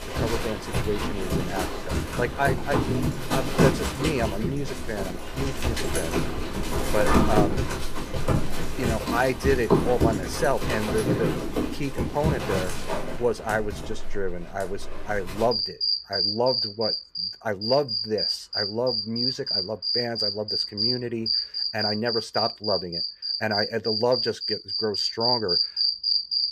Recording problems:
animal sounds; very loud; throughout; 3 dB above the speech

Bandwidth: 14.5 kHz